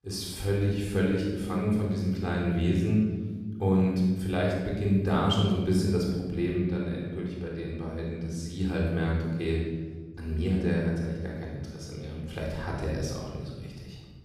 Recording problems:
room echo; strong; dies away in 1.6 s
off-mic speech; far

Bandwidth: 15 kHz